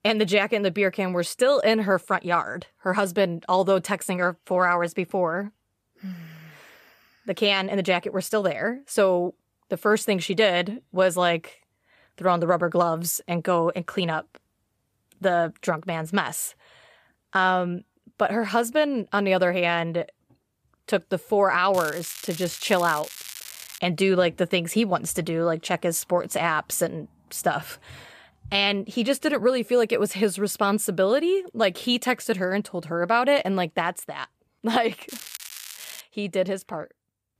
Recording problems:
crackling; noticeable; from 22 to 24 s and at 35 s; 15 dB below the speech

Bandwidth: 14.5 kHz